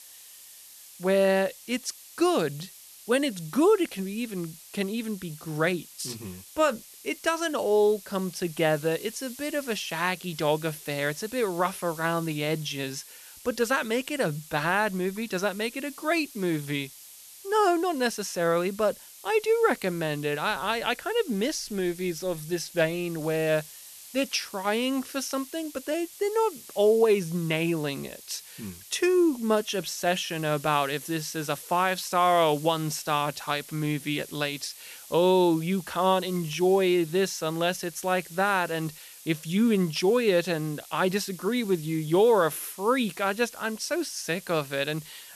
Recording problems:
hiss; noticeable; throughout; 15 dB below the speech

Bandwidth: 13.5 kHz